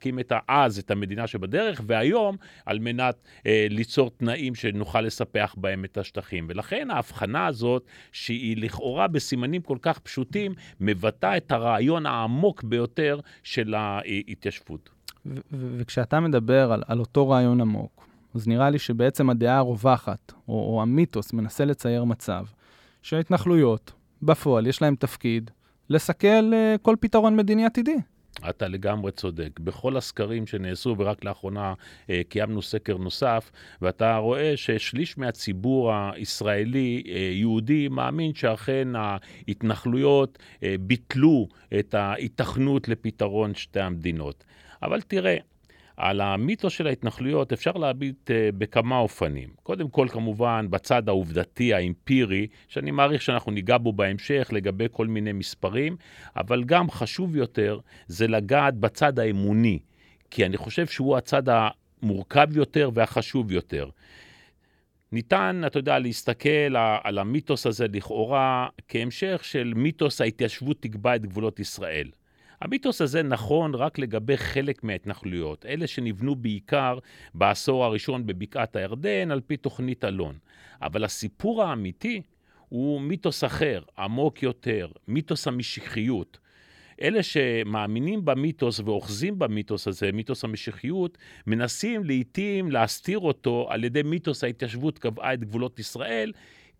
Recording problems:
none

